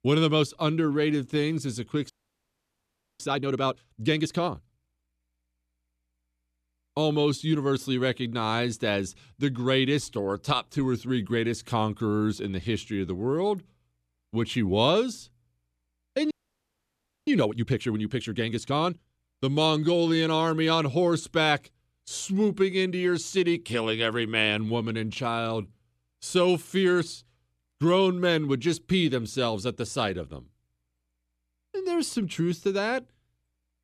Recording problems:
audio freezing; at 2 s for 1 s and at 16 s for 1 s

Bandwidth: 14 kHz